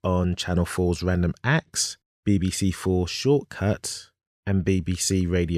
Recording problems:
abrupt cut into speech; at the end

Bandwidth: 14.5 kHz